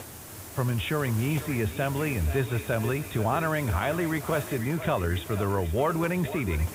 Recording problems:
high frequencies cut off; severe; nothing above 4 kHz
echo of what is said; noticeable; throughout; 480 ms later, 15 dB below the speech
hiss; noticeable; throughout; 10 dB below the speech

